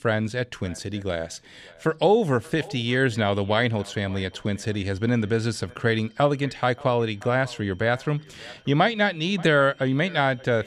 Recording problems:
echo of what is said; faint; throughout; 580 ms later, 25 dB below the speech
high-pitched whine; faint; from 4 s on; 3 kHz, 35 dB below the speech

